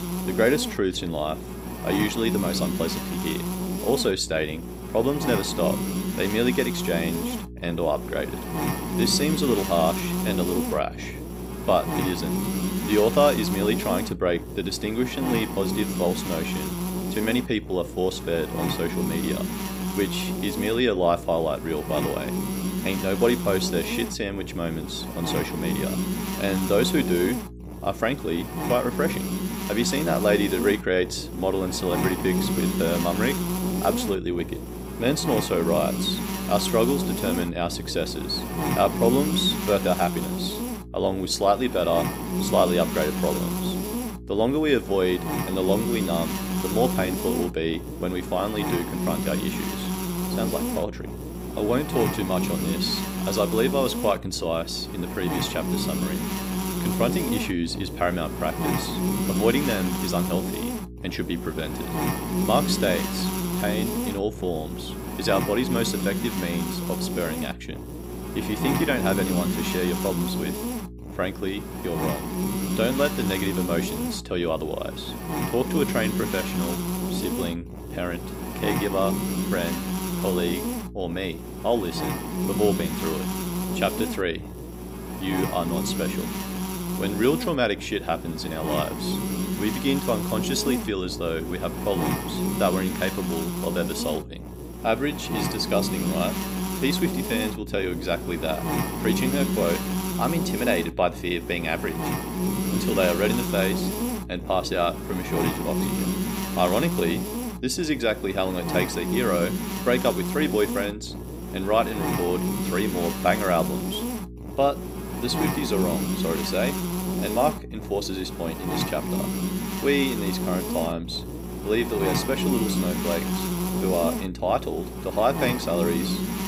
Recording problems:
electrical hum; loud; throughout; 60 Hz, 6 dB below the speech

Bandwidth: 15.5 kHz